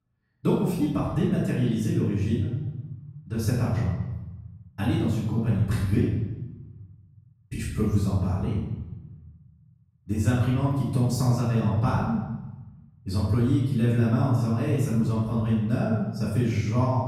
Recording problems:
off-mic speech; far
room echo; noticeable; dies away in 1 s

